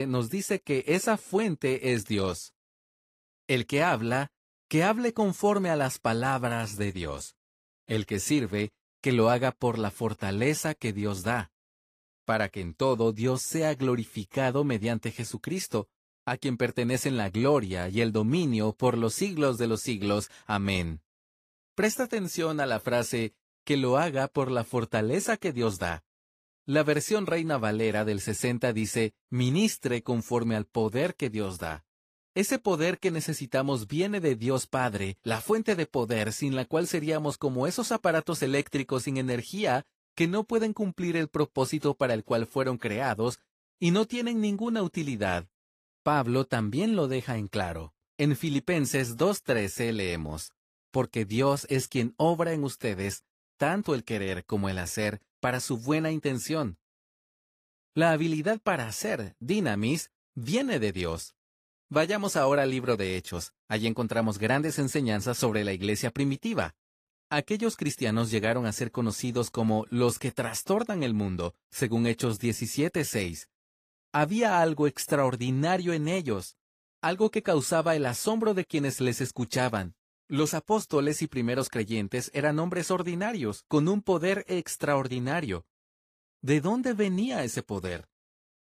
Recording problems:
garbled, watery; slightly; nothing above 15 kHz
abrupt cut into speech; at the start

